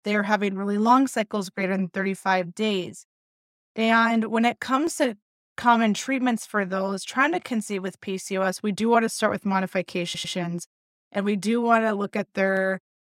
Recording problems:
audio stuttering; at 10 s

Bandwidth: 16 kHz